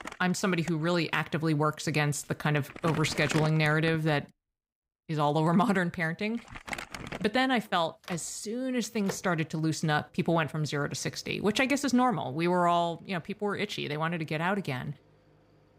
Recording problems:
household noises; noticeable; throughout; 10 dB below the speech

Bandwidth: 15.5 kHz